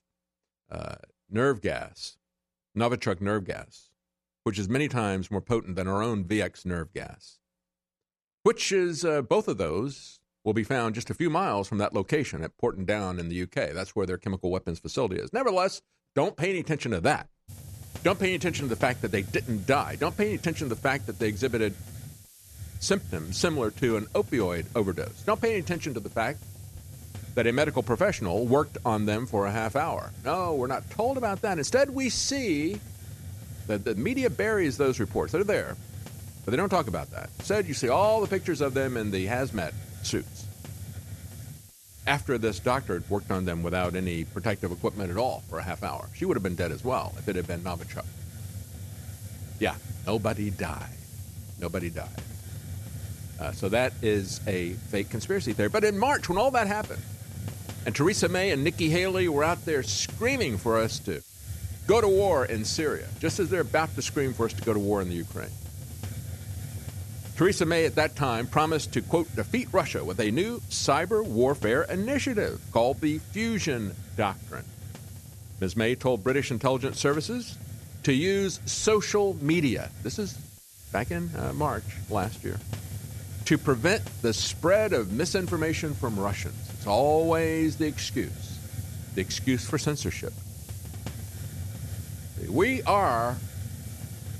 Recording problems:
hiss; noticeable; from 17 s on; 10 dB below the speech

